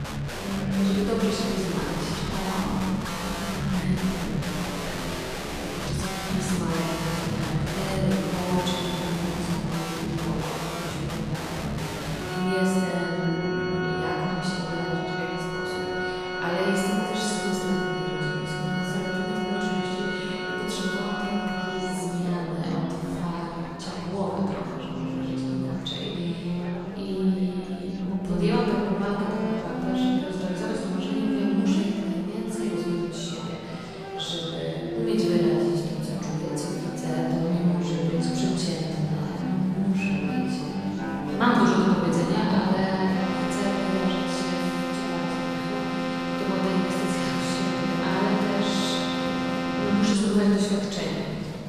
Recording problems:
room echo; strong; dies away in 2.7 s
off-mic speech; far
background music; loud; throughout; 2 dB below the speech
chatter from many people; noticeable; throughout; 15 dB below the speech

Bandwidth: 14.5 kHz